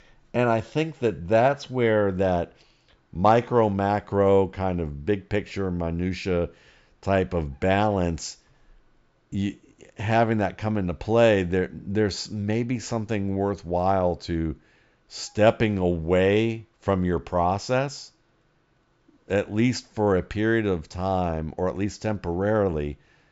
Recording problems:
high frequencies cut off; noticeable; nothing above 8 kHz

